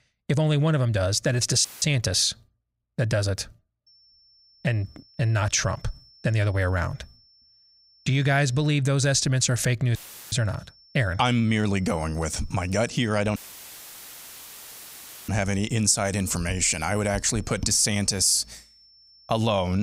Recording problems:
high-pitched whine; faint; from 4 to 8.5 s and from 10 s on; 5.5 kHz, 30 dB below the speech
audio cutting out; filled with static; at 1.5 s, at 10 s and at 13 s for 2 s
abrupt cut into speech; at the end

